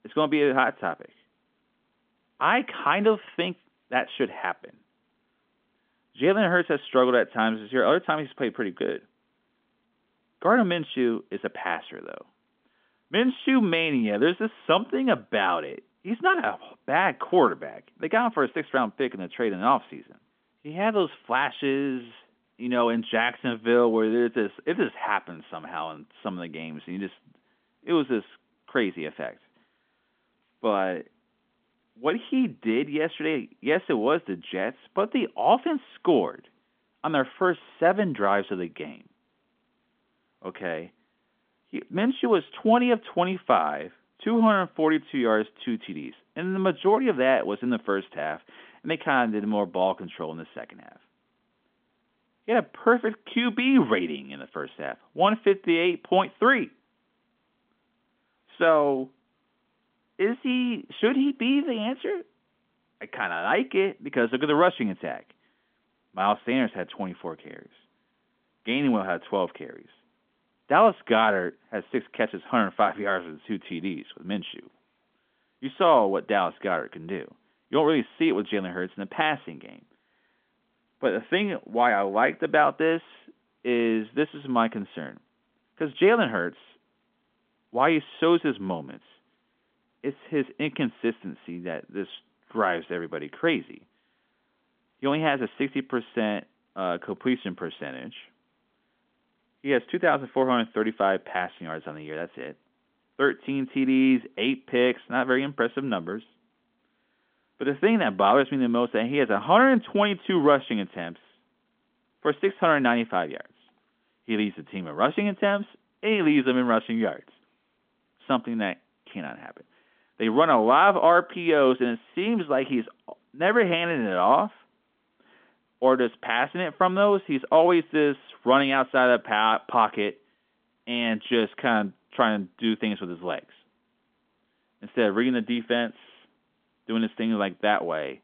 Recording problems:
phone-call audio; nothing above 3.5 kHz

